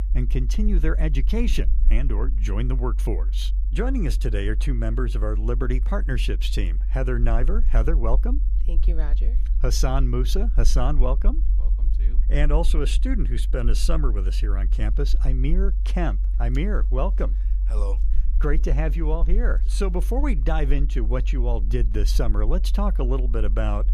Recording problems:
low rumble; noticeable; throughout; 15 dB below the speech

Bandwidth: 14.5 kHz